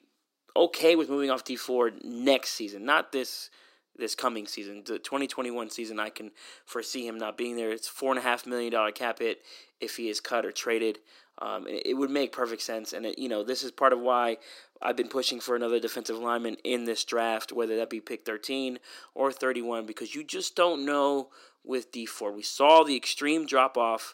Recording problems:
thin; somewhat; fading below 300 Hz

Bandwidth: 16 kHz